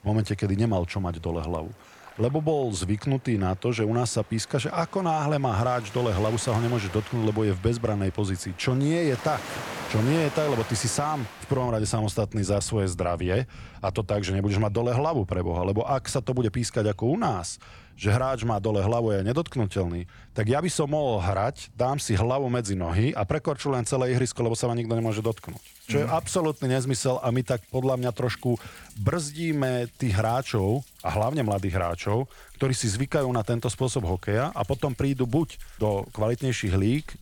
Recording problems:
rain or running water; noticeable; throughout; 20 dB below the speech

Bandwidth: 18.5 kHz